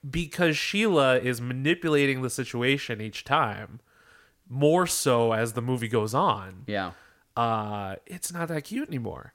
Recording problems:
none

